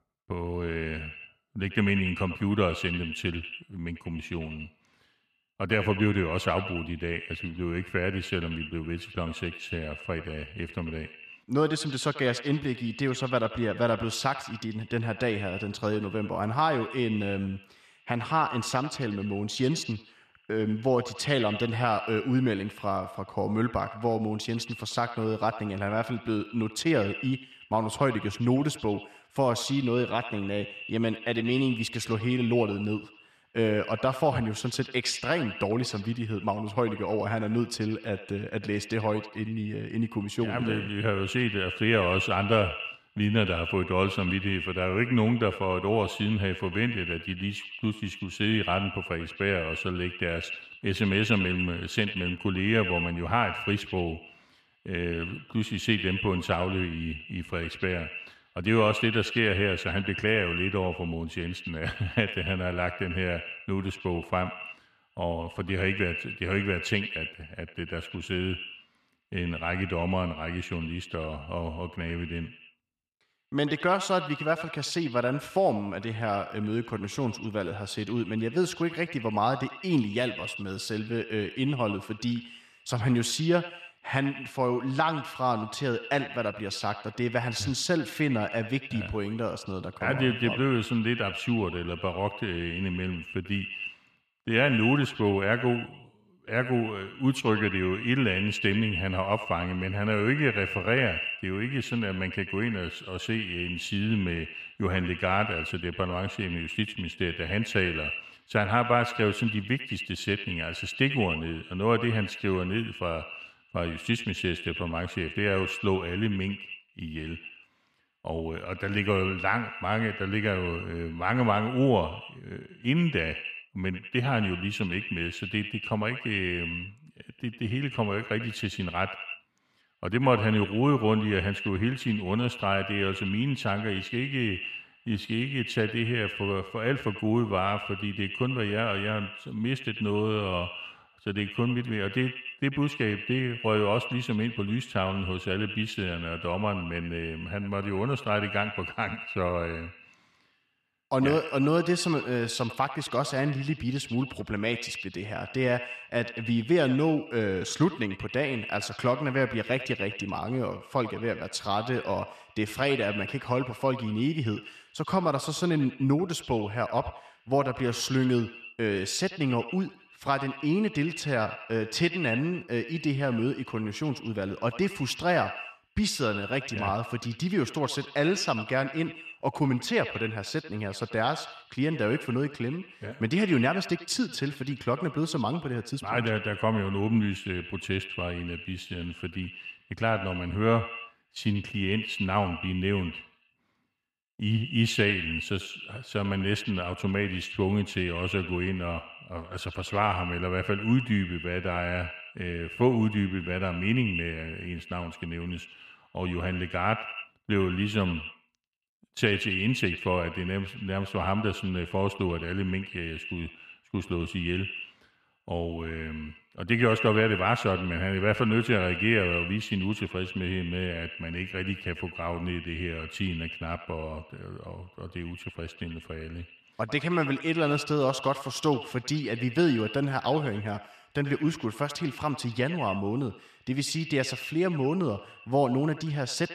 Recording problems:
echo of what is said; strong; throughout; 90 ms later, 9 dB below the speech

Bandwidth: 14 kHz